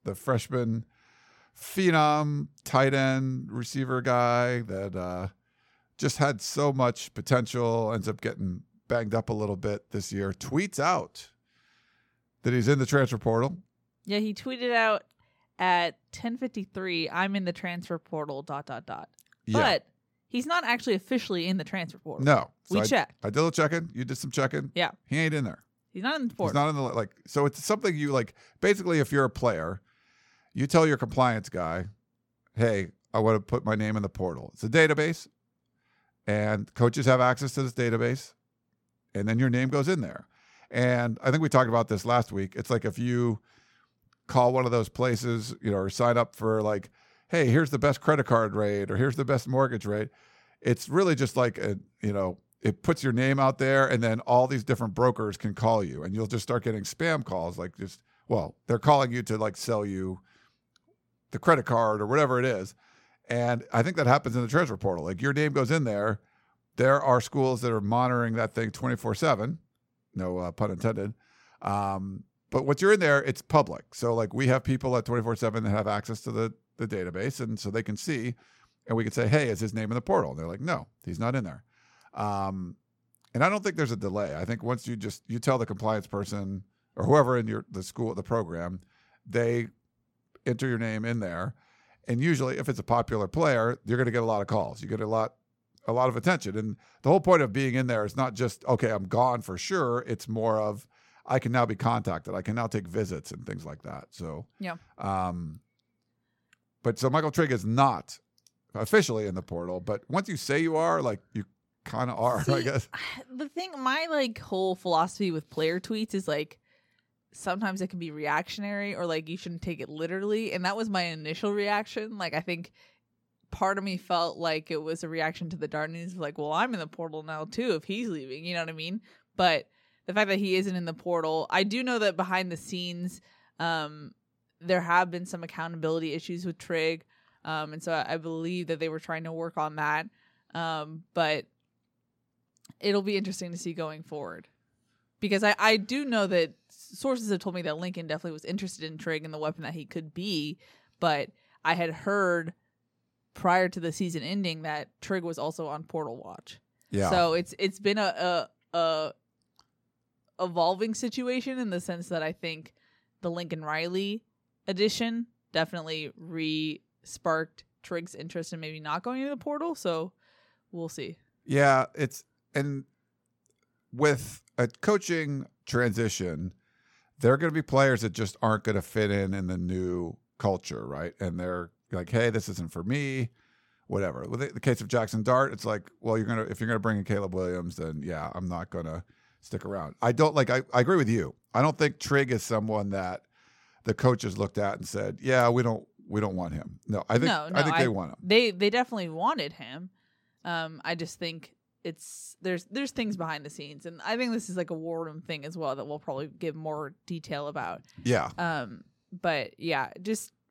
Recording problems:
none

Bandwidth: 17 kHz